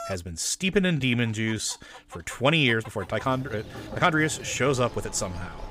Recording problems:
machinery noise; noticeable; from 3 s on; 15 dB below the speech
animal sounds; faint; throughout; 25 dB below the speech
uneven, jittery; strongly

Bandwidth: 15.5 kHz